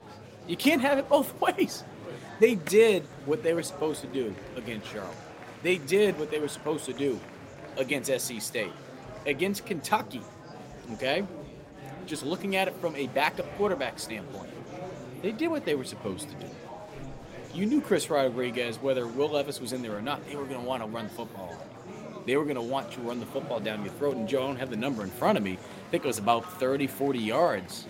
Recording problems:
murmuring crowd; noticeable; throughout; 15 dB below the speech

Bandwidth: 16 kHz